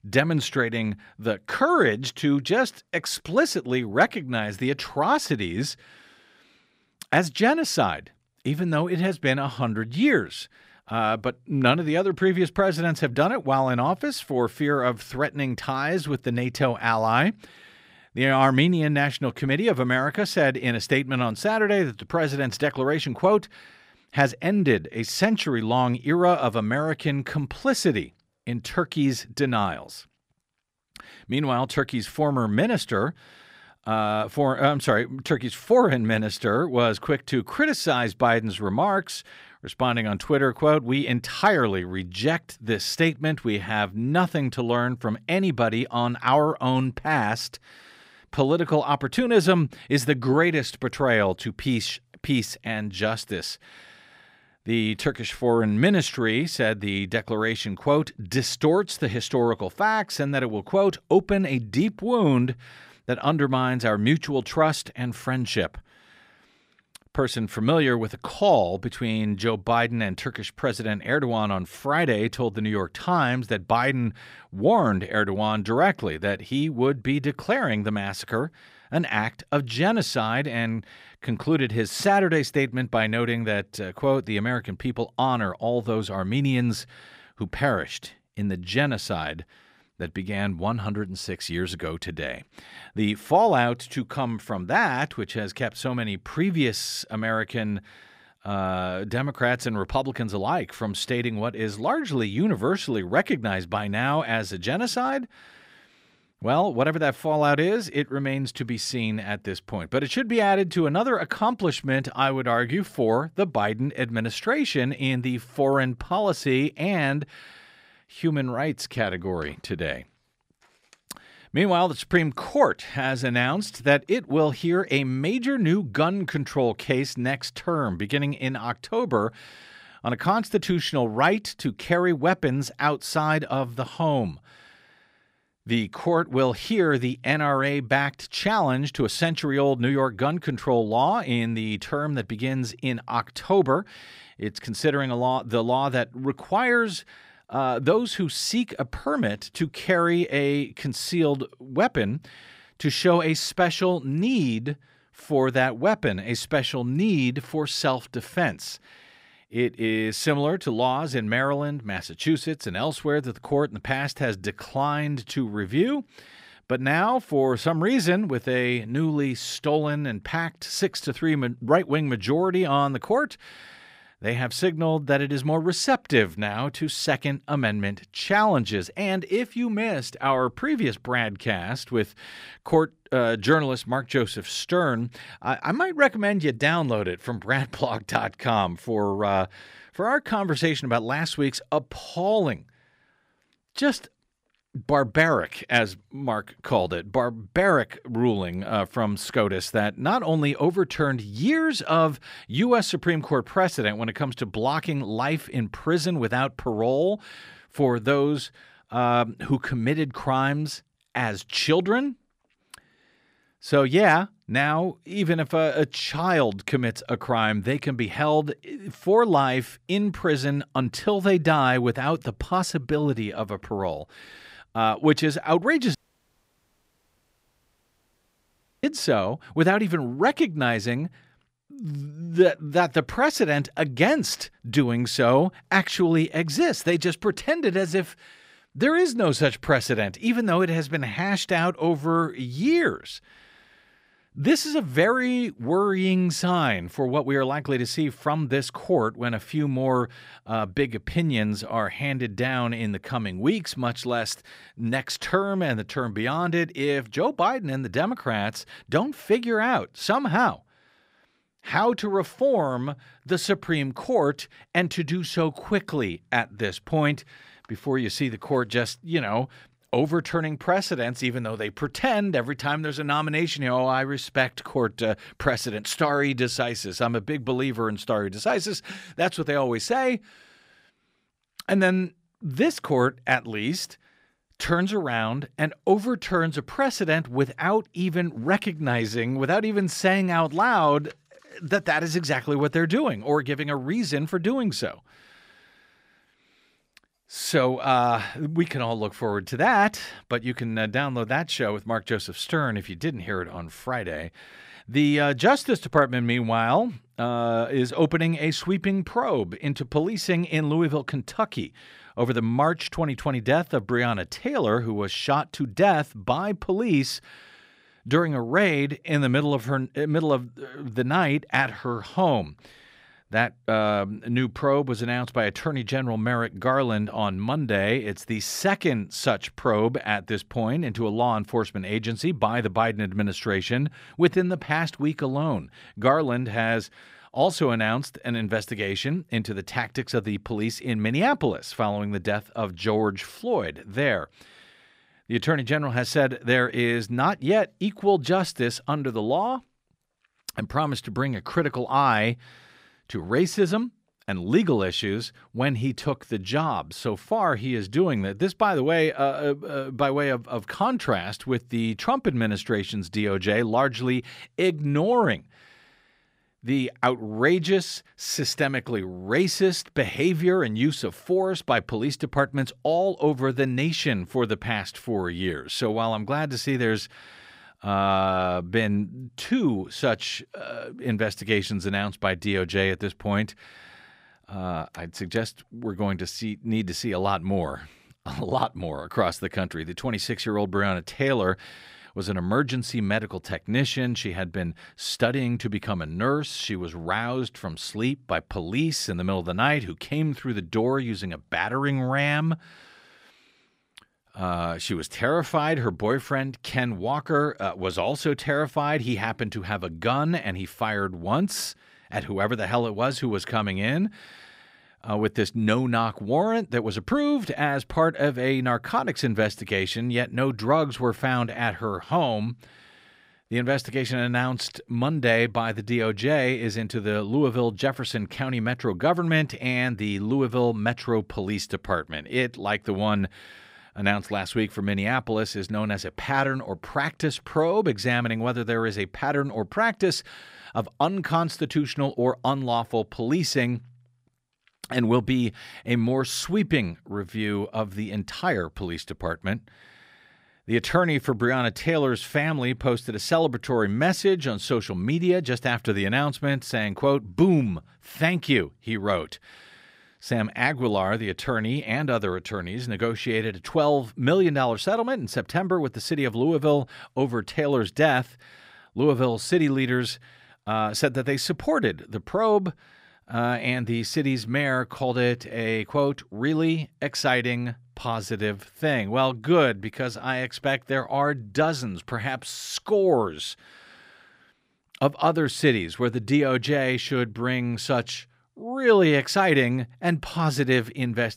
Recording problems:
audio cutting out; at 3:46 for 3 s

